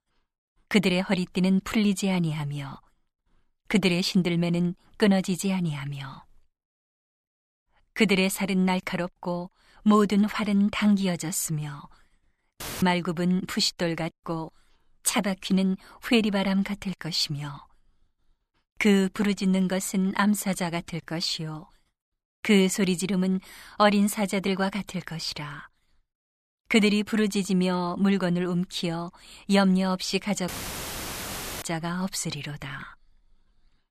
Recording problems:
audio cutting out; filled with static; at 13 s and at 30 s for 1 s

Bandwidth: 14.5 kHz